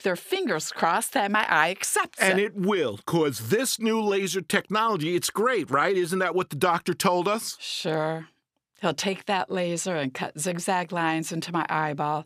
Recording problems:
none

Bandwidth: 15 kHz